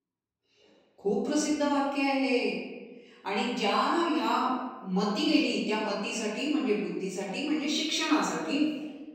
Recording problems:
off-mic speech; far
room echo; noticeable; dies away in 1.1 s

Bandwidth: 16.5 kHz